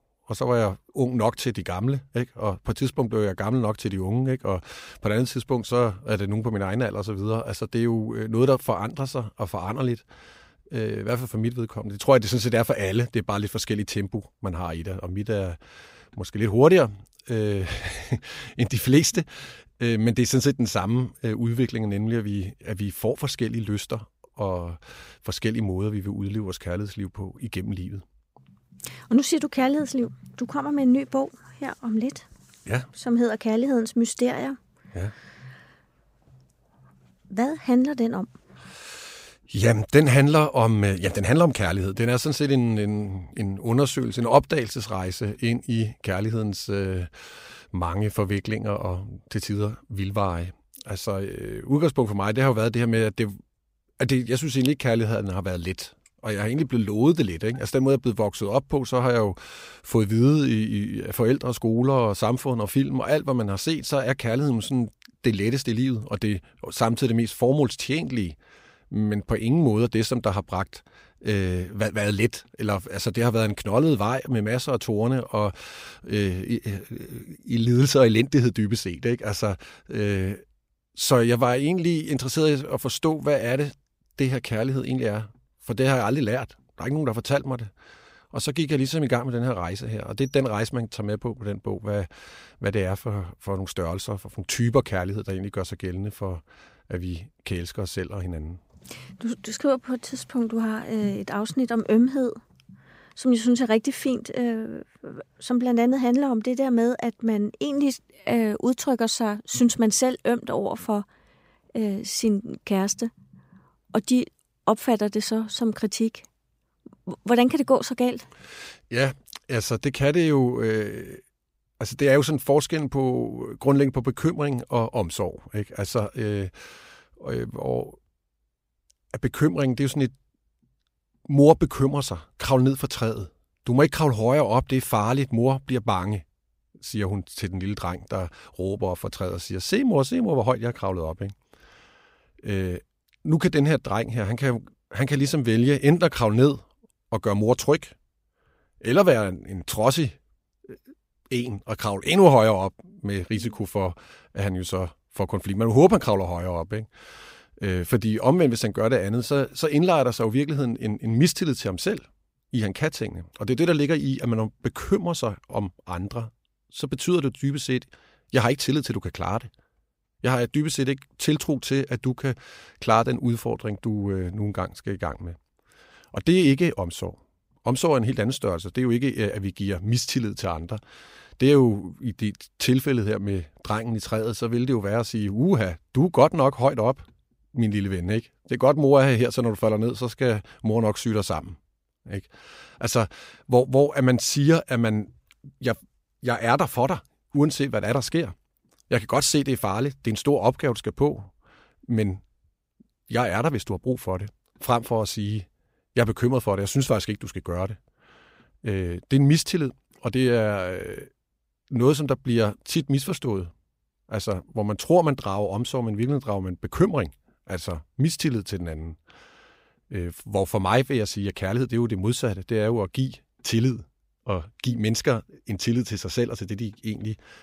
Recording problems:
none

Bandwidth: 15.5 kHz